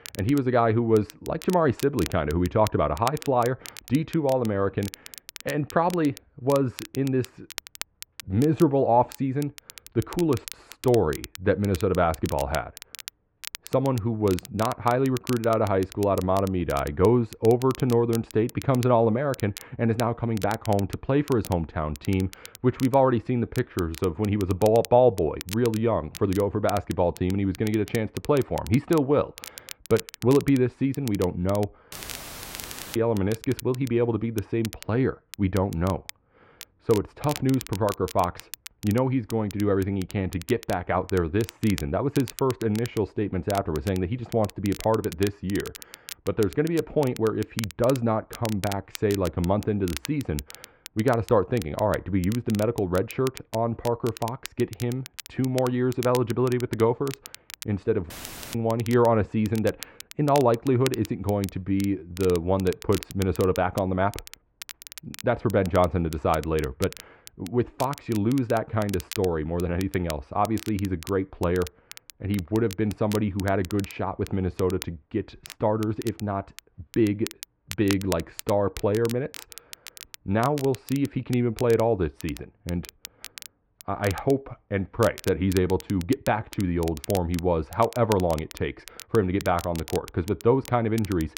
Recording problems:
muffled; very; fading above 1.5 kHz
crackle, like an old record; noticeable; 15 dB below the speech
audio cutting out; filled with static; at 32 s for 1 s and at 58 s

